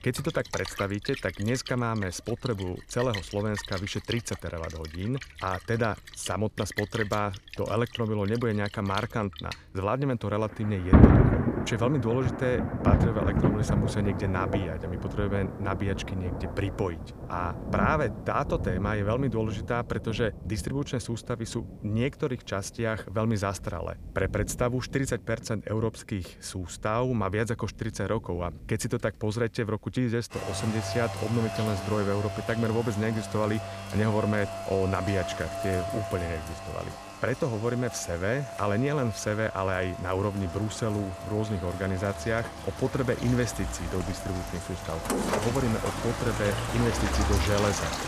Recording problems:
rain or running water; loud; throughout; 2 dB below the speech

